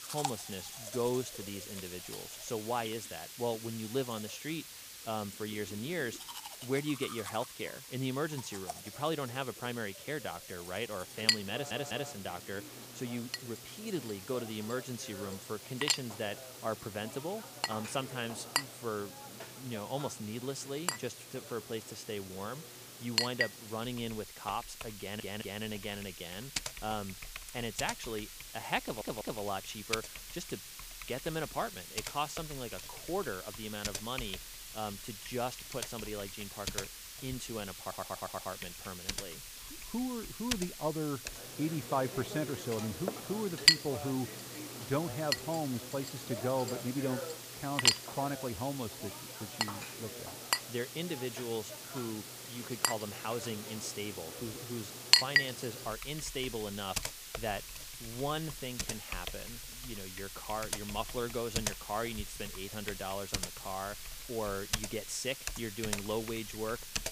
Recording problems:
household noises; very loud; throughout; 3 dB above the speech
hiss; loud; throughout; 6 dB below the speech
audio stuttering; 4 times, first at 12 s

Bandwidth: 15 kHz